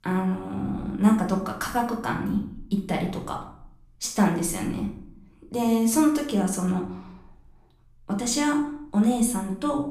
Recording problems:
off-mic speech; far
room echo; slight; dies away in 0.5 s

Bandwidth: 14.5 kHz